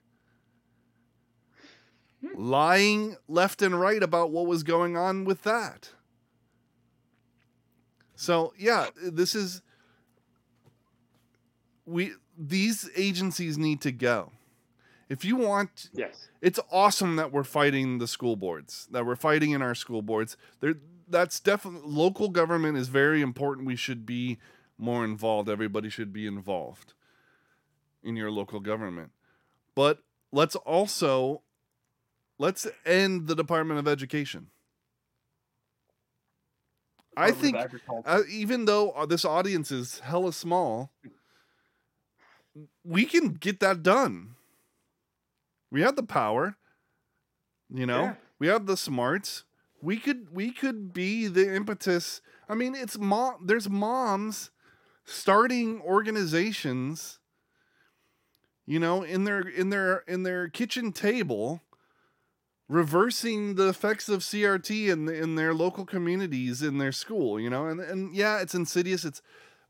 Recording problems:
none

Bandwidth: 16.5 kHz